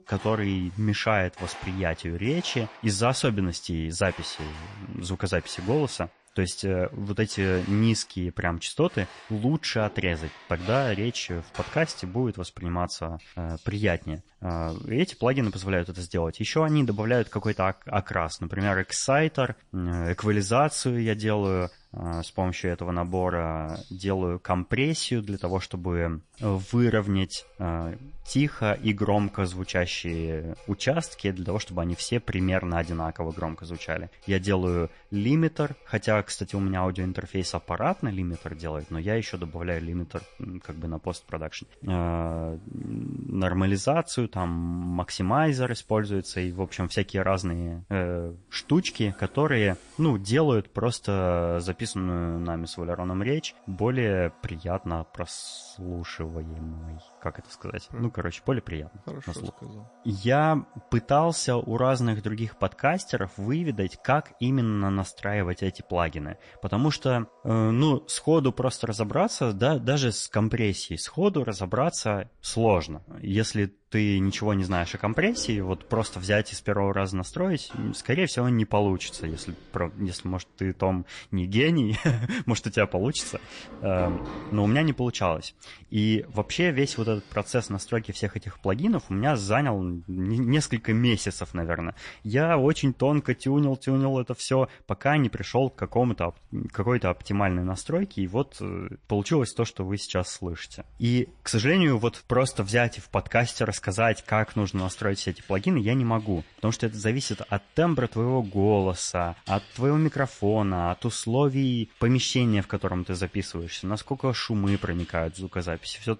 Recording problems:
garbled, watery; slightly; nothing above 10 kHz
household noises; faint; throughout; 25 dB below the speech

